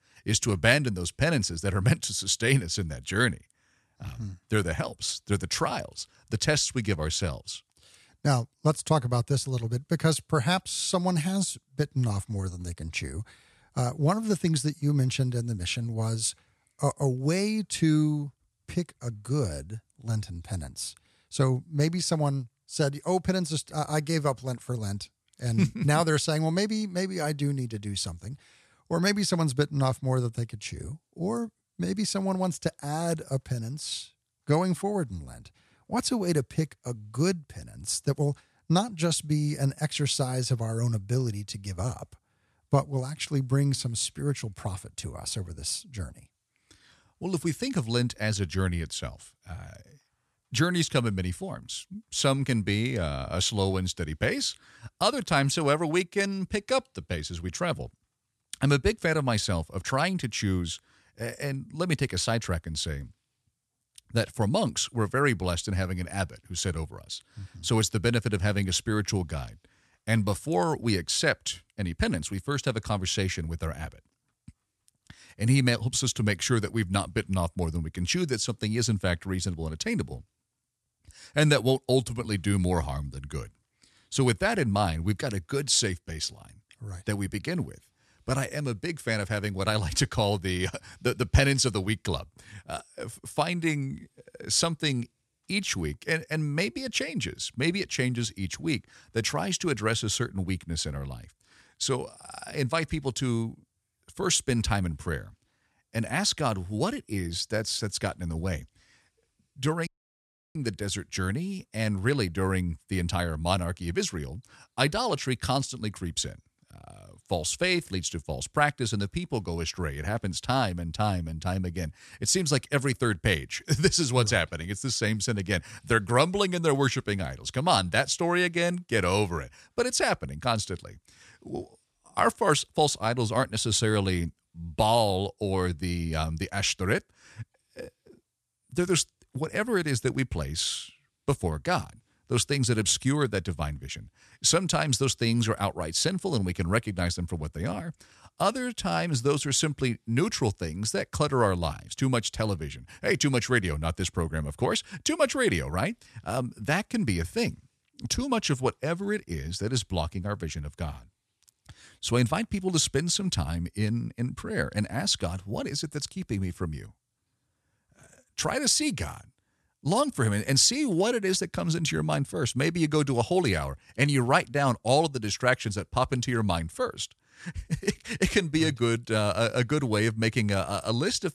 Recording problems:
audio cutting out; at 1:50 for 0.5 s

